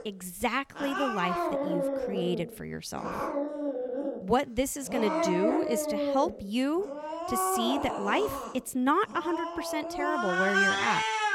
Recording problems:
animal sounds; very loud; throughout; as loud as the speech

